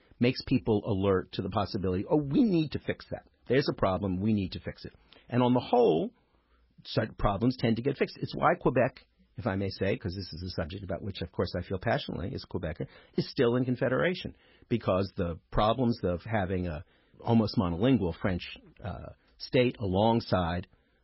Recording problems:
garbled, watery; badly; nothing above 5.5 kHz

